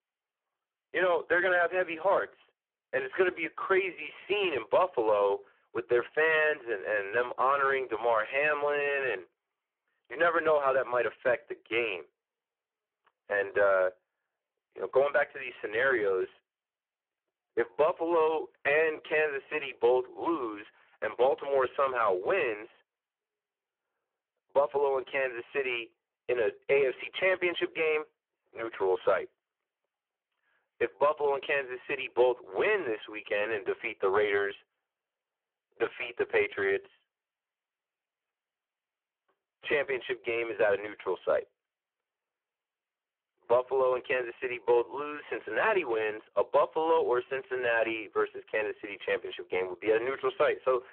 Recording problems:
phone-call audio; poor line

